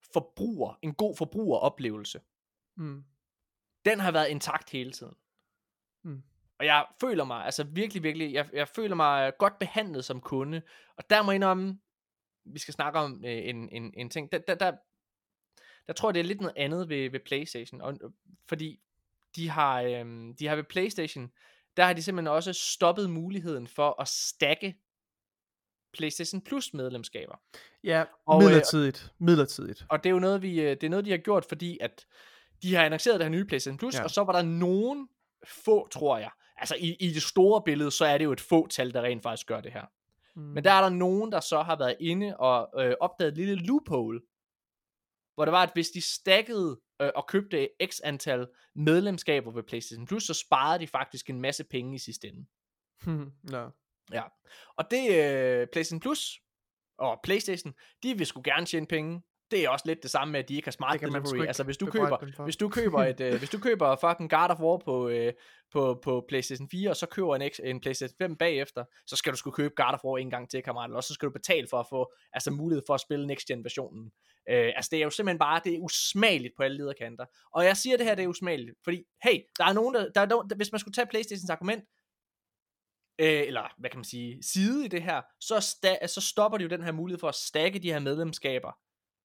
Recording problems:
none

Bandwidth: 17.5 kHz